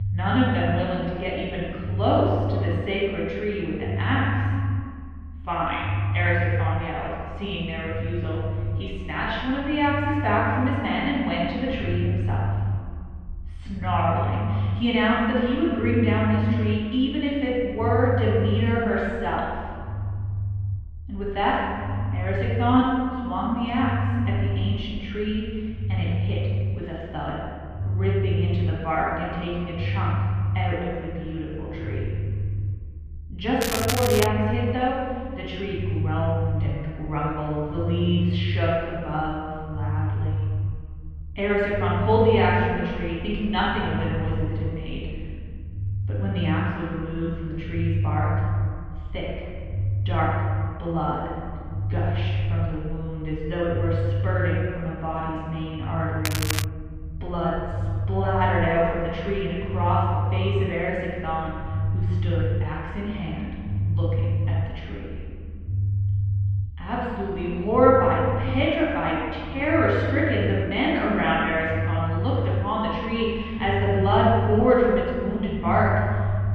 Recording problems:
room echo; strong; dies away in 2.2 s
off-mic speech; far
muffled; very; fading above 3 kHz
echo of what is said; faint; throughout; 210 ms later, 20 dB below the speech
crackling; loud; at 34 s and at 56 s; 3 dB below the speech
low rumble; noticeable; throughout; 15 dB below the speech

